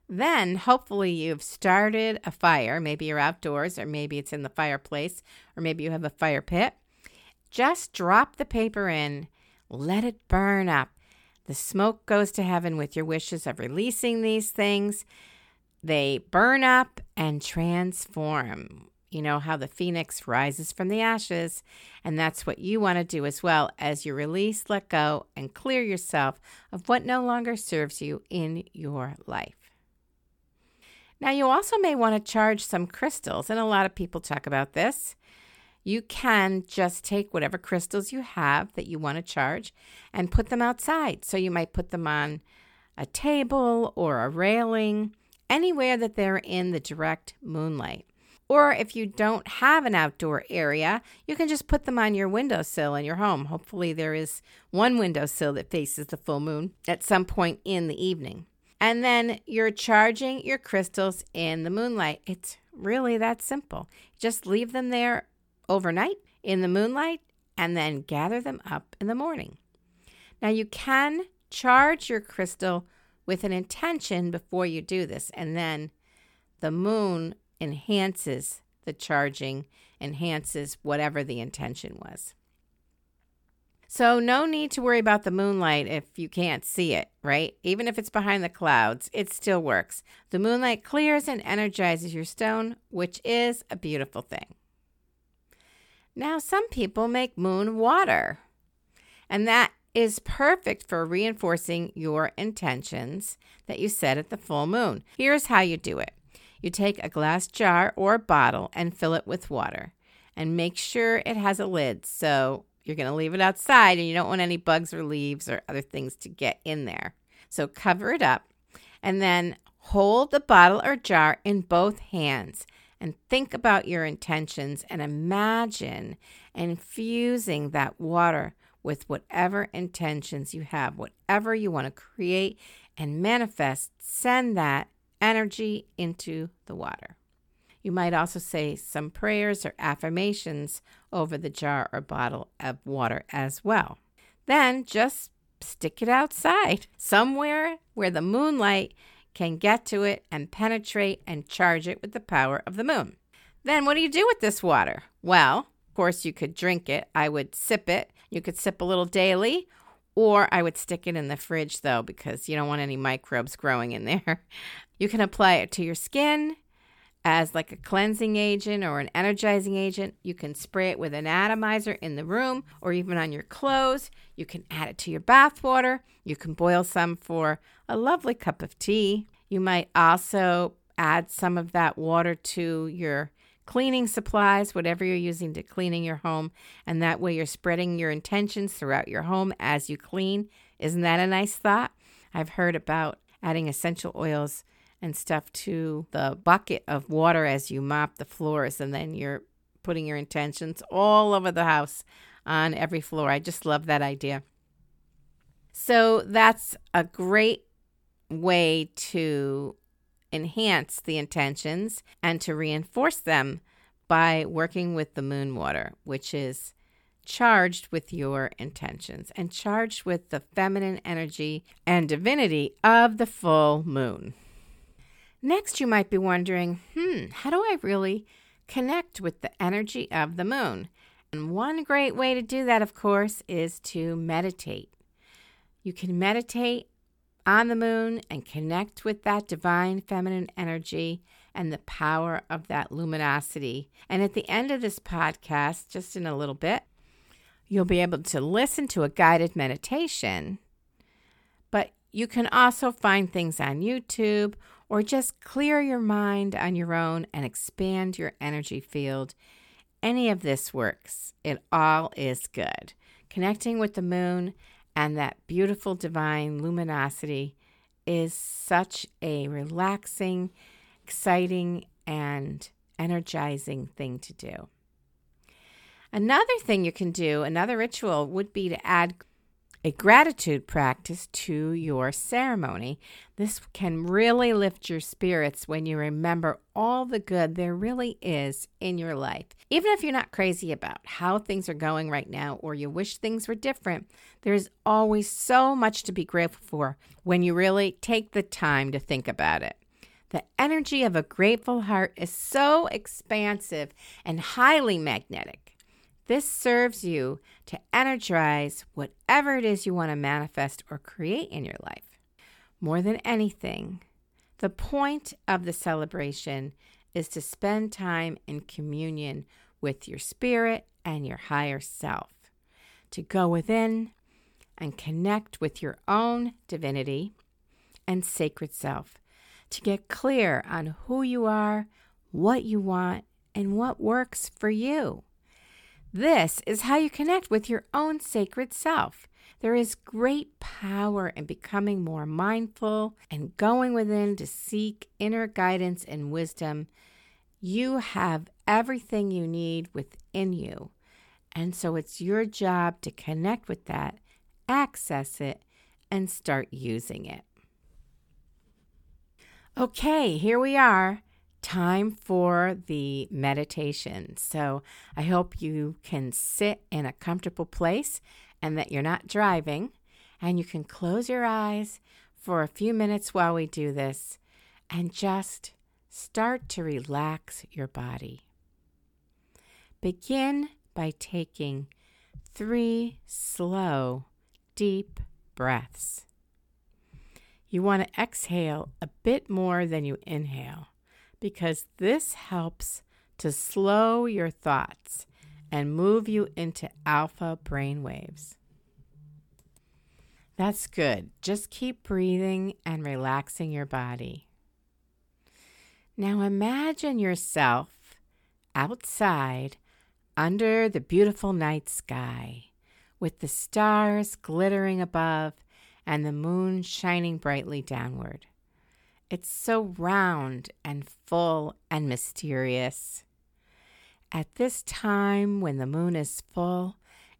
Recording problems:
none

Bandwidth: 18 kHz